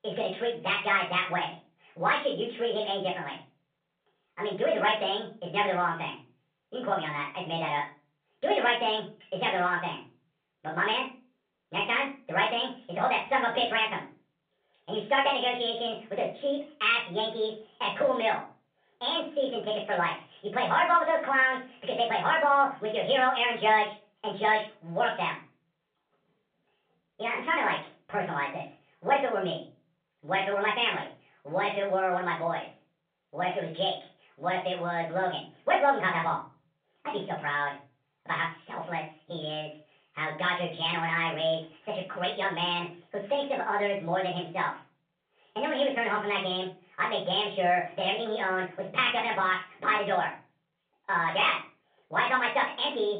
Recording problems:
off-mic speech; far
wrong speed and pitch; too fast and too high; 1.5 times normal speed
room echo; slight; dies away in 0.3 s
phone-call audio

